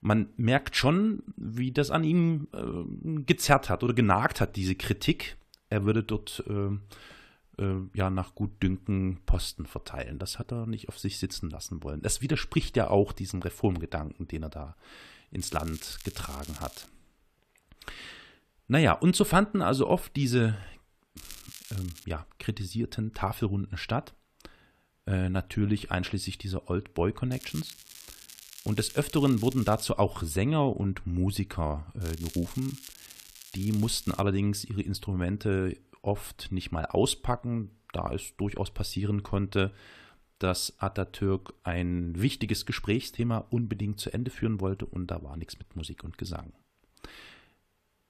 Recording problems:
crackling; noticeable; 4 times, first at 15 s; 15 dB below the speech

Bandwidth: 14.5 kHz